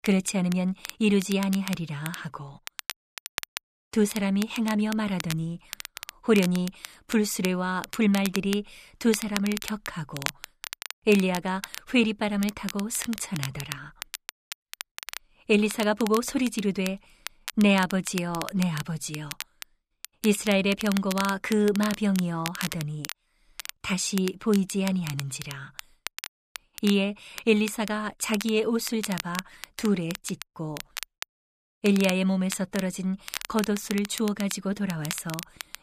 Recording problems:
crackle, like an old record; noticeable; 10 dB below the speech

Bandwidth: 14.5 kHz